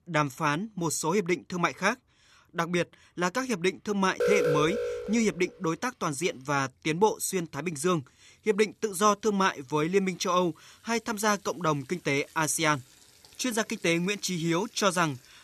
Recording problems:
household noises; faint; throughout; 30 dB below the speech
alarm; loud; from 4 to 5 s; peak 2 dB above the speech

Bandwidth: 13.5 kHz